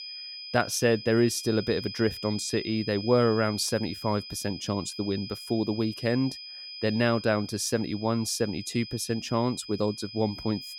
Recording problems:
high-pitched whine; noticeable; throughout; 5 kHz, 10 dB below the speech

